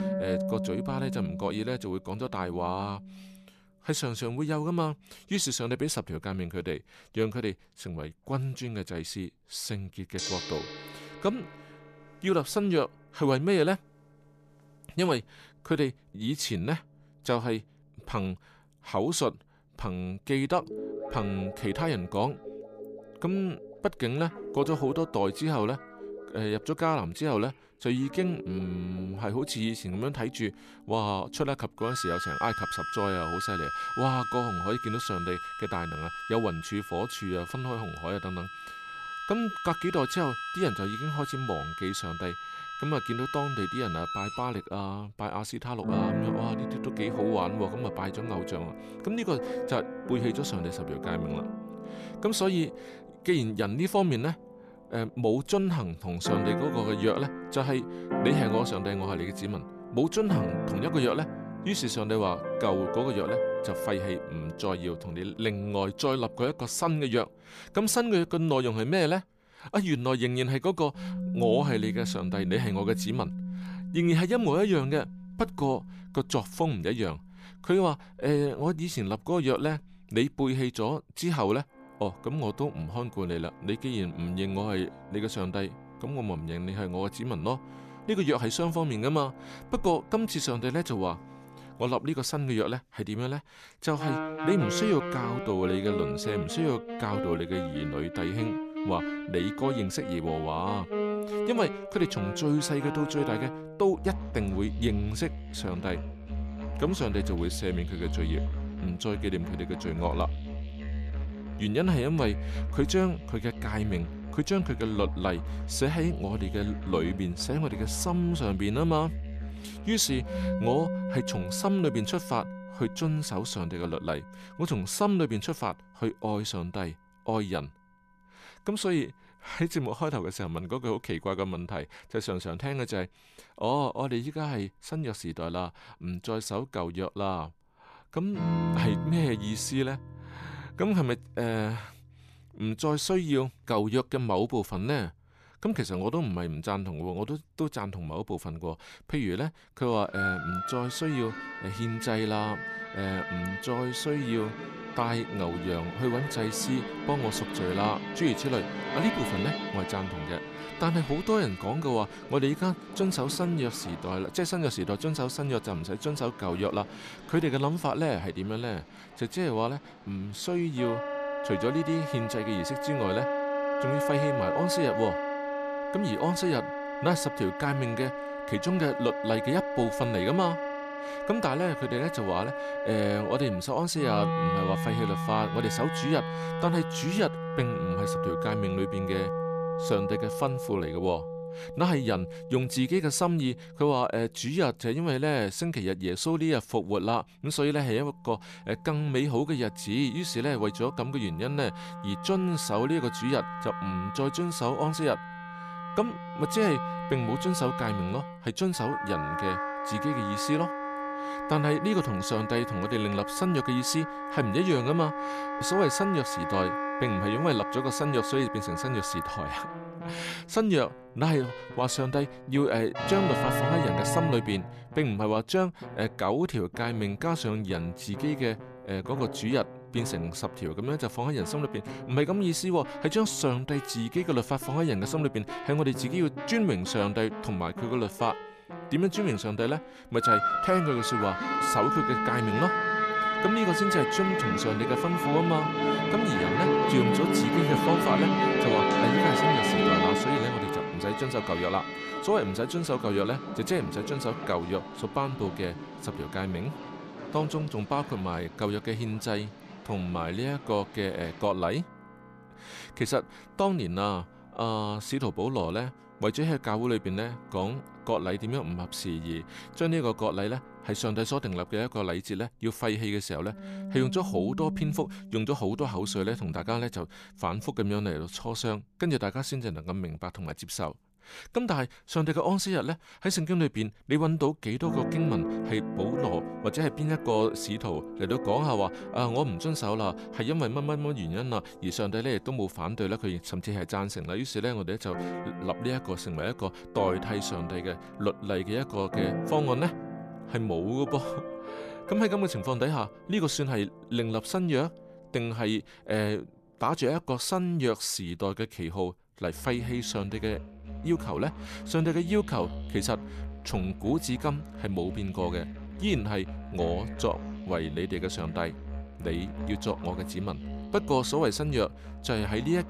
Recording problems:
background music; loud; throughout; 4 dB below the speech

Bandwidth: 14.5 kHz